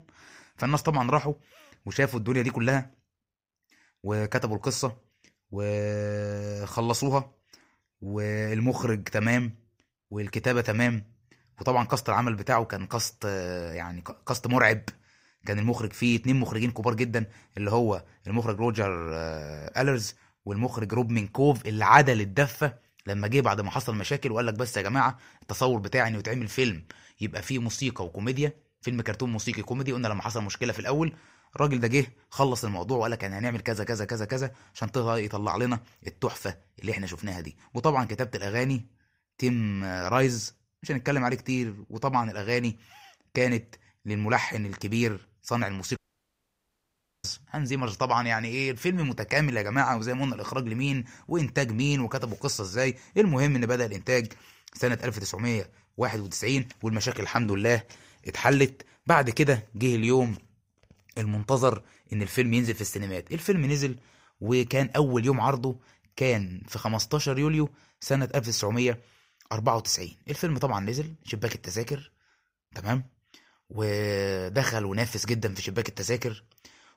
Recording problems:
audio cutting out; at 46 s for 1.5 s

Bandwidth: 15.5 kHz